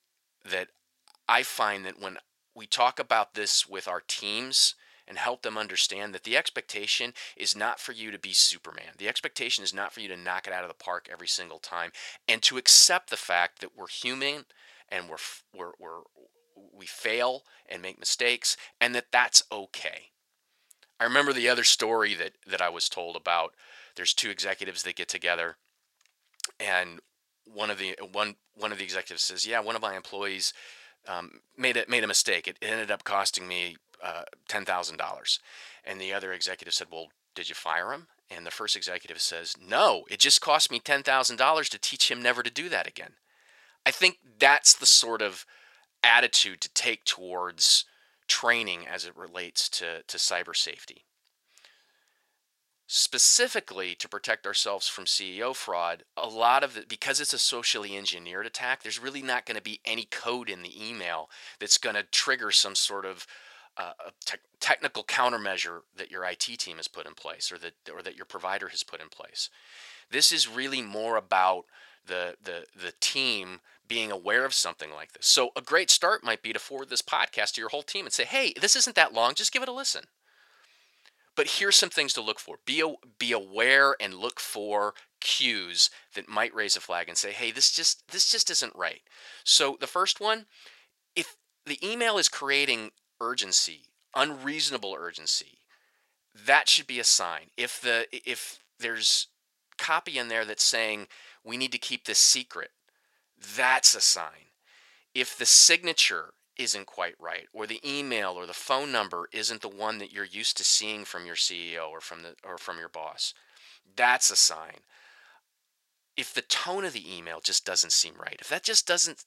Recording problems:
thin; very; fading below 600 Hz

